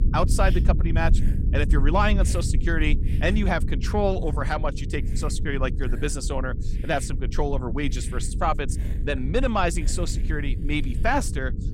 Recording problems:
low rumble; noticeable; throughout; 15 dB below the speech
electrical hum; faint; throughout; 60 Hz, 20 dB below the speech
hiss; faint; throughout; 25 dB below the speech

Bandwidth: 16 kHz